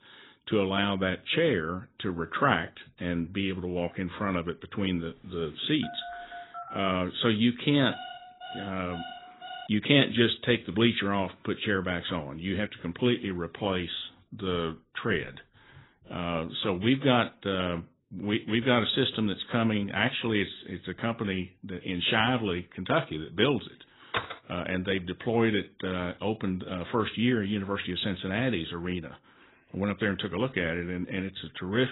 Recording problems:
garbled, watery; badly; nothing above 4 kHz
phone ringing; faint; from 6 to 7 s; peak 10 dB below the speech
alarm; faint; from 8 to 9.5 s; peak 10 dB below the speech
door banging; noticeable; at 24 s; peak 4 dB below the speech
abrupt cut into speech; at the end

